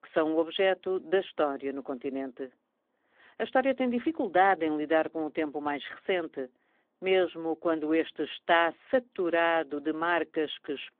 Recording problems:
phone-call audio; nothing above 3.5 kHz

